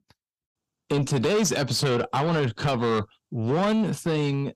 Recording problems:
distortion; heavy; 7 dB below the speech

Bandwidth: 15.5 kHz